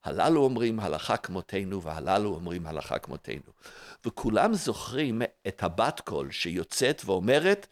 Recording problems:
none

